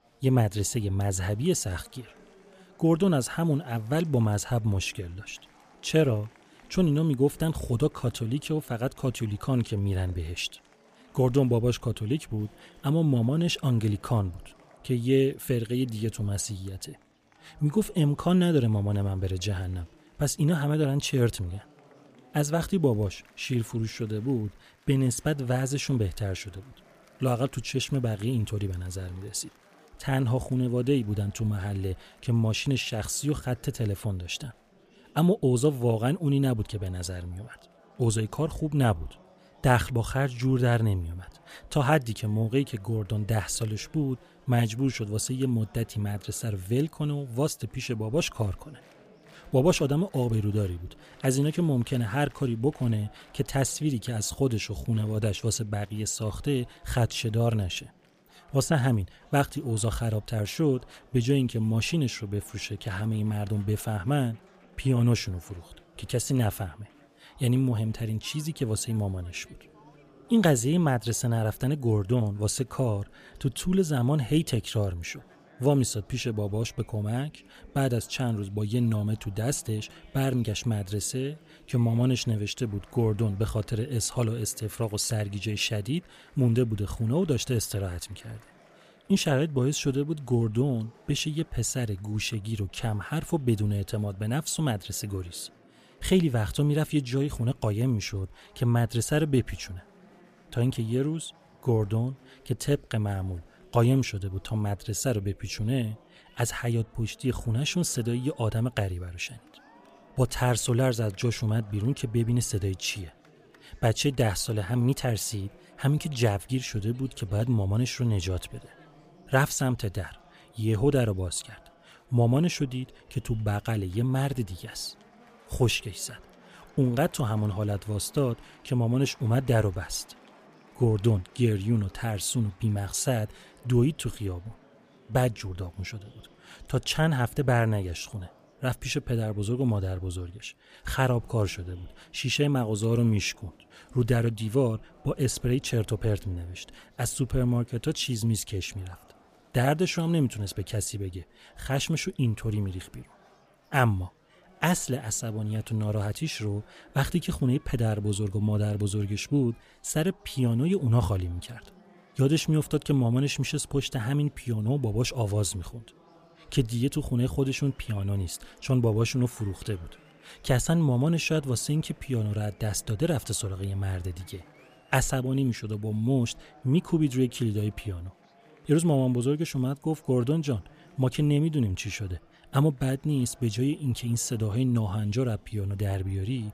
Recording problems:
murmuring crowd; faint; throughout; 30 dB below the speech

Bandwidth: 15 kHz